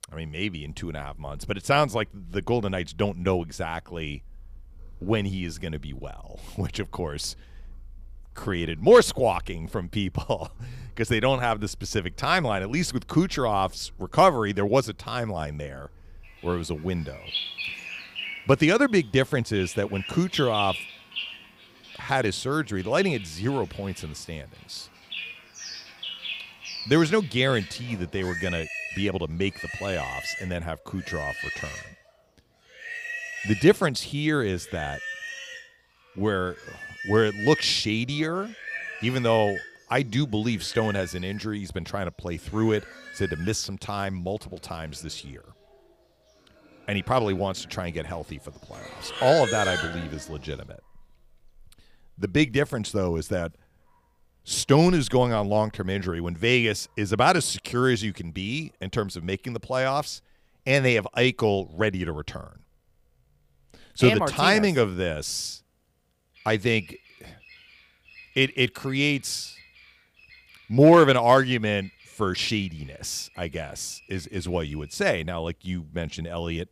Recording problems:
animal sounds; noticeable; throughout; 10 dB below the speech

